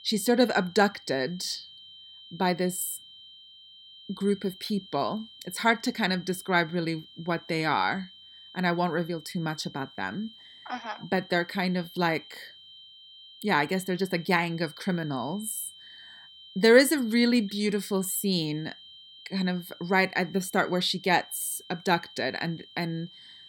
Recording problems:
high-pitched whine; noticeable; throughout; 3 kHz, 20 dB below the speech

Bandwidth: 17.5 kHz